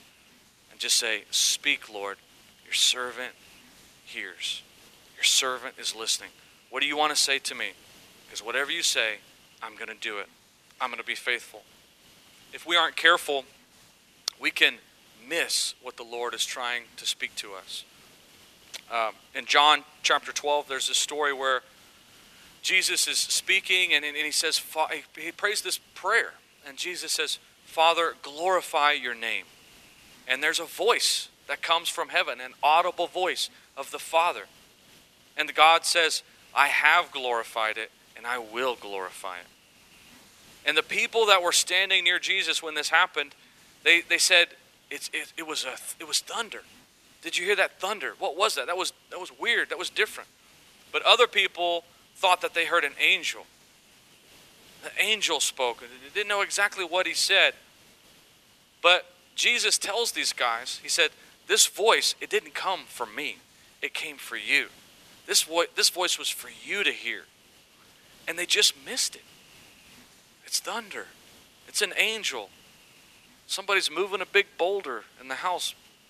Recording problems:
thin; very; fading below 350 Hz
hiss; faint; throughout; 30 dB below the speech

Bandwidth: 14.5 kHz